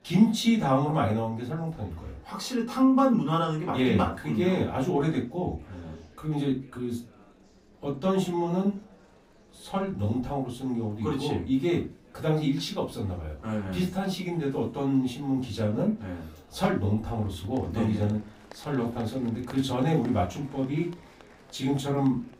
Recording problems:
off-mic speech; far
room echo; very slight; dies away in 0.2 s
murmuring crowd; faint; throughout; 25 dB below the speech

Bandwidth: 15.5 kHz